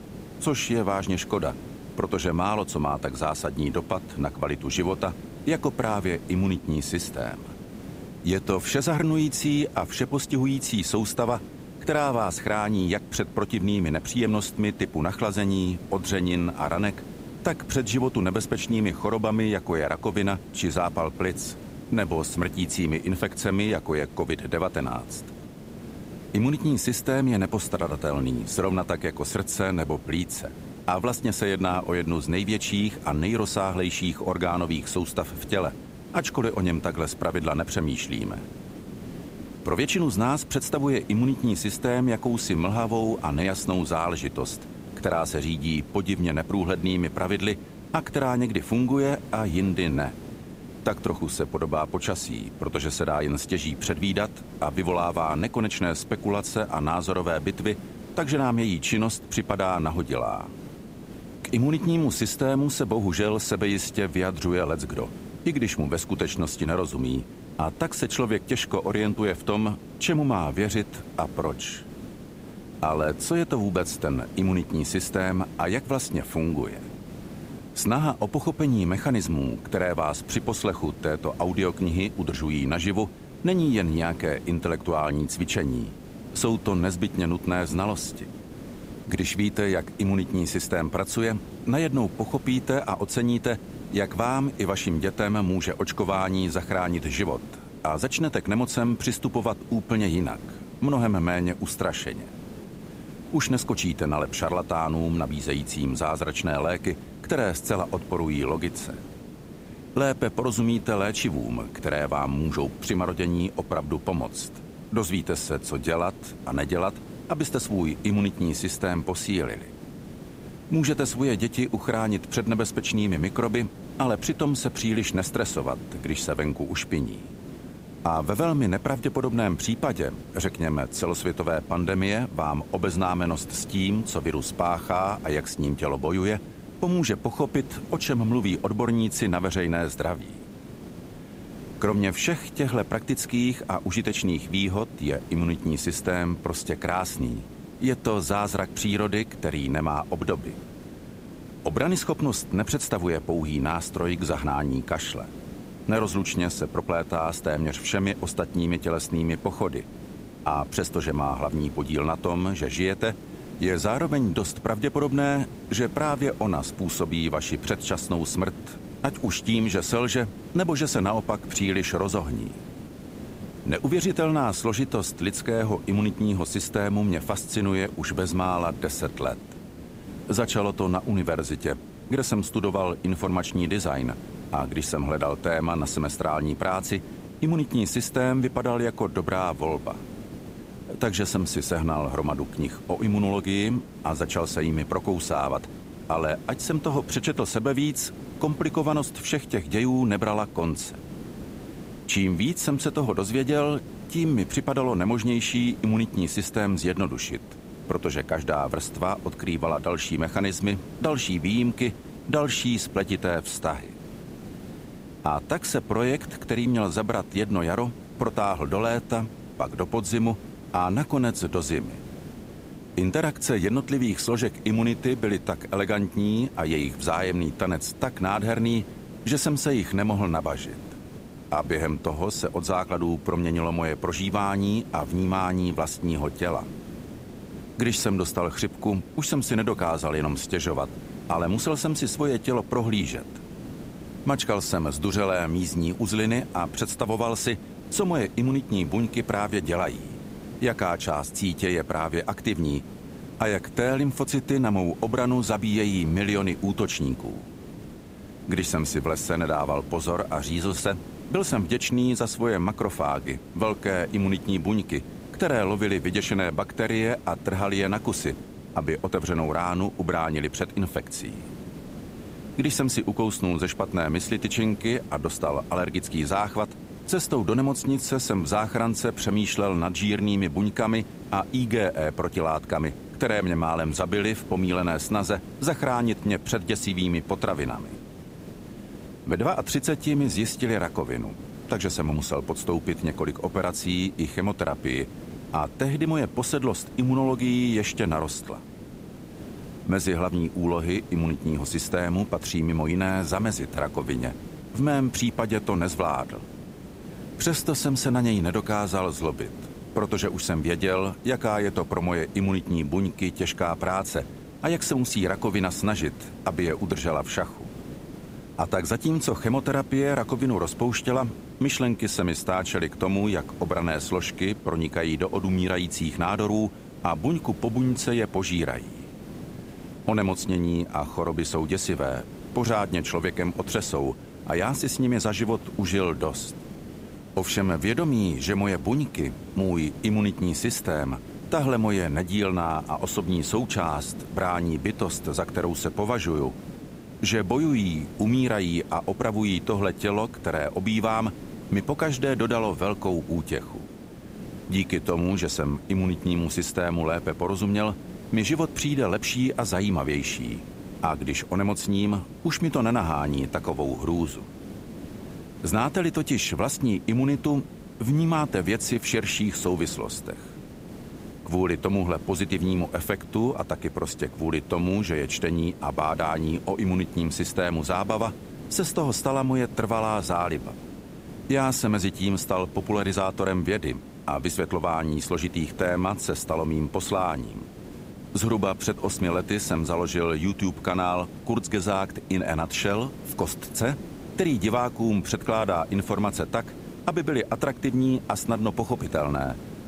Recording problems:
hiss; noticeable; throughout; 15 dB below the speech

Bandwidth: 15.5 kHz